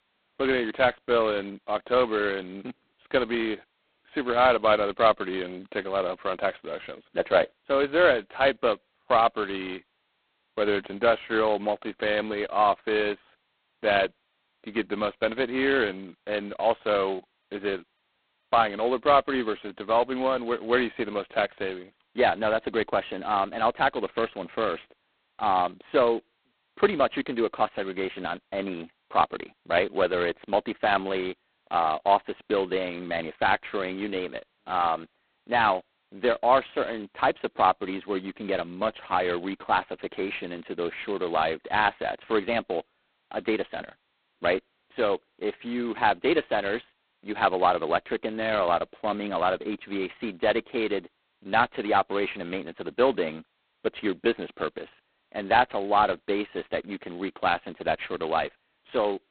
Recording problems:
phone-call audio; poor line; nothing above 4 kHz

